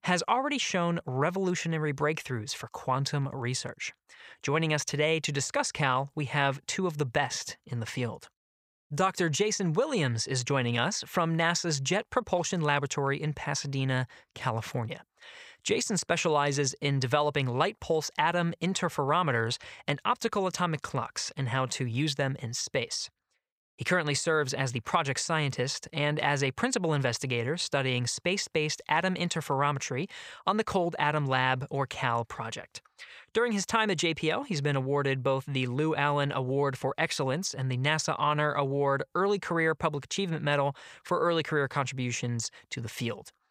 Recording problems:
none

